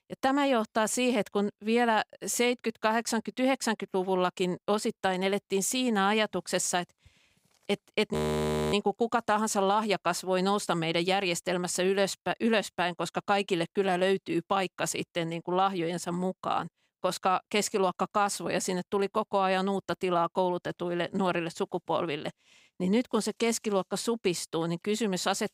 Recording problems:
audio freezing; at 8 s for 0.5 s

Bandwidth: 15.5 kHz